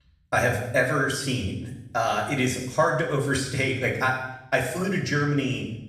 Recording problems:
off-mic speech; far
room echo; noticeable; dies away in 0.8 s

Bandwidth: 14 kHz